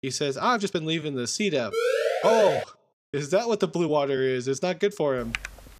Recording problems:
uneven, jittery; strongly; from 0.5 to 5 s
siren; loud; at 1.5 s; peak 2 dB above the speech
keyboard typing; noticeable; at 5 s; peak 8 dB below the speech

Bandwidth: 14.5 kHz